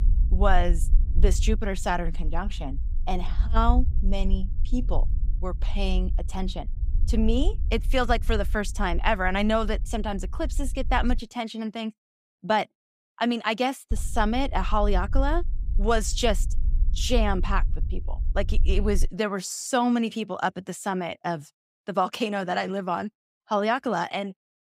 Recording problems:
low rumble; faint; until 11 s and from 14 to 19 s; 25 dB below the speech

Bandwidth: 15.5 kHz